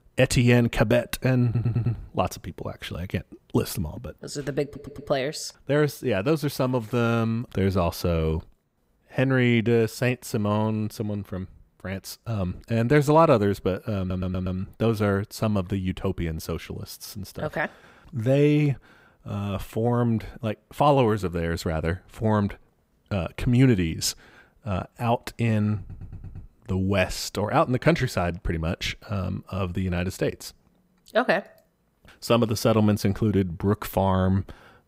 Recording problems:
audio stuttering; 4 times, first at 1.5 s

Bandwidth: 15.5 kHz